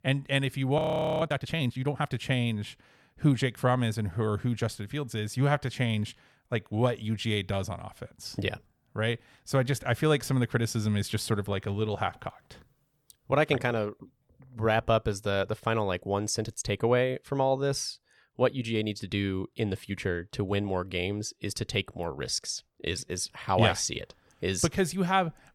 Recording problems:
audio freezing; at 1 s

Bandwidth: 18.5 kHz